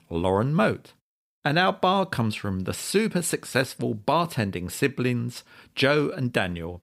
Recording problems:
none

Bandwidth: 15.5 kHz